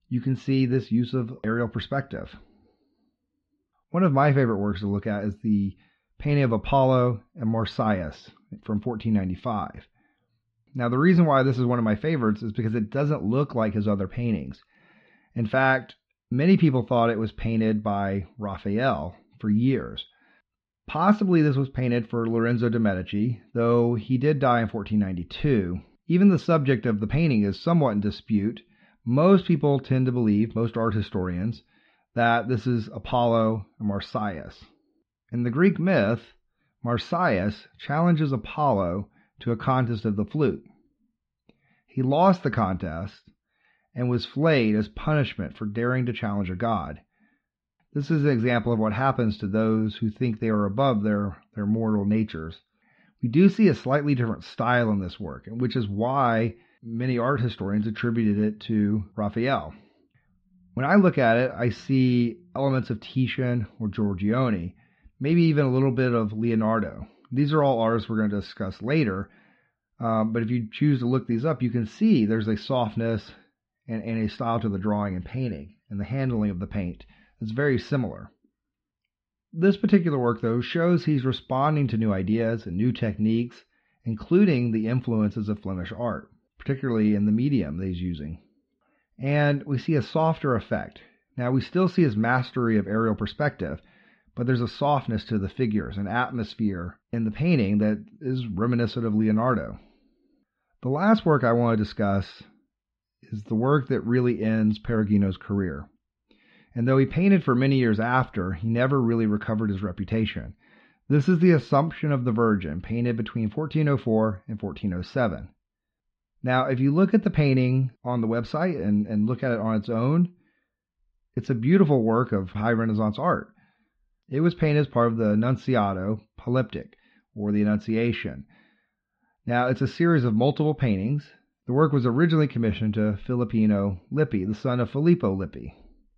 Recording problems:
muffled; slightly; fading above 3.5 kHz

